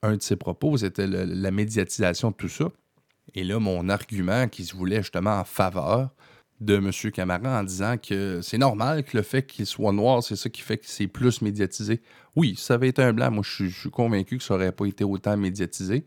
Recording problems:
none

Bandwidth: 18.5 kHz